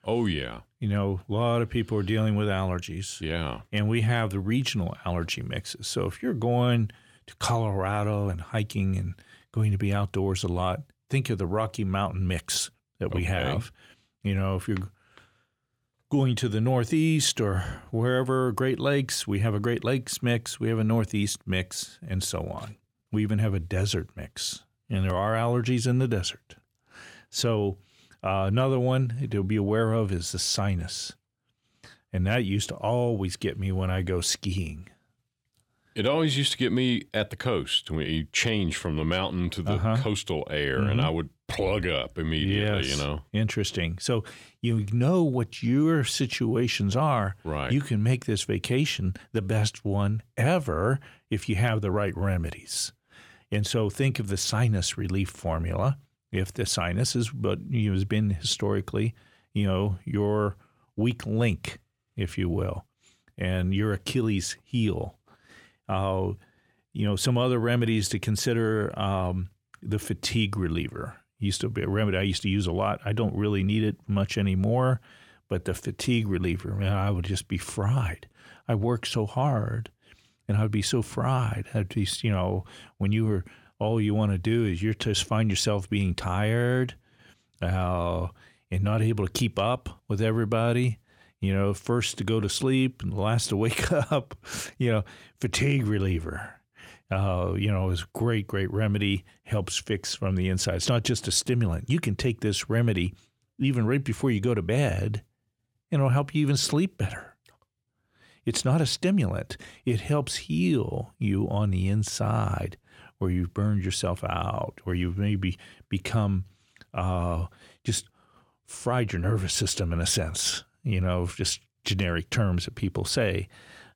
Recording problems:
uneven, jittery; slightly; from 38 s to 1:55

